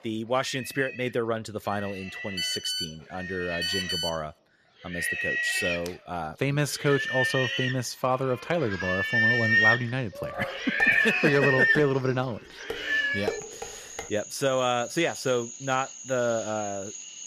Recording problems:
animal sounds; very loud; throughout; 2 dB above the speech
phone ringing; loud; from 2.5 to 4 s; peak 1 dB above the speech
clattering dishes; noticeable; from 11 to 14 s; peak 5 dB below the speech

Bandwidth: 14.5 kHz